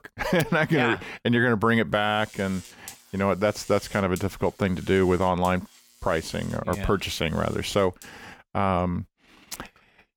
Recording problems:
electrical hum; faint; from 2 to 8.5 s; 50 Hz, 25 dB below the speech

